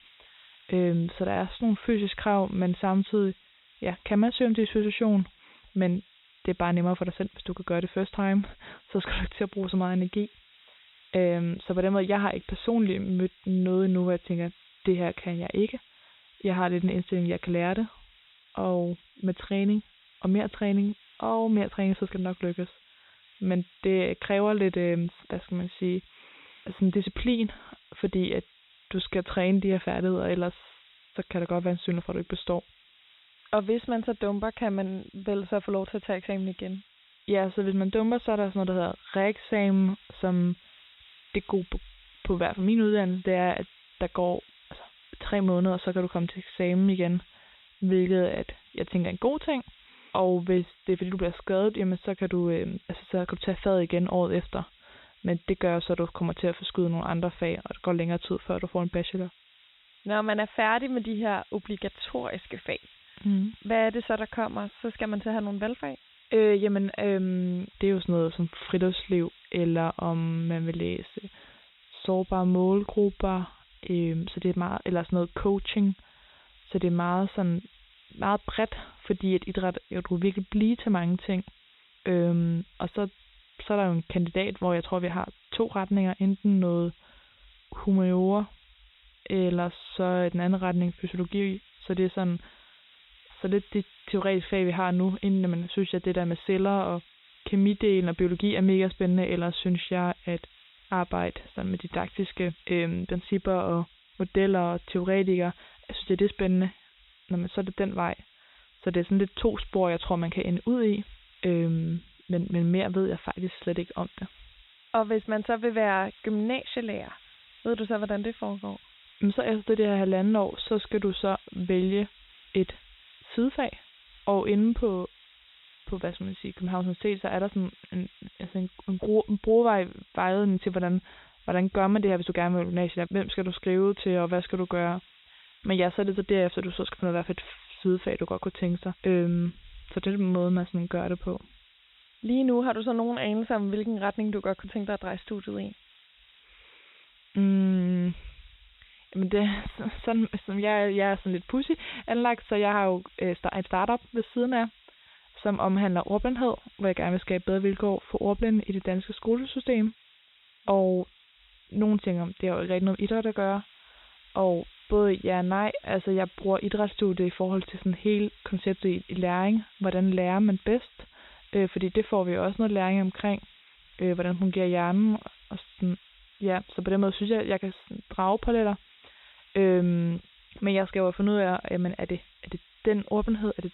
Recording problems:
high frequencies cut off; severe; nothing above 4 kHz
hiss; faint; throughout; 25 dB below the speech

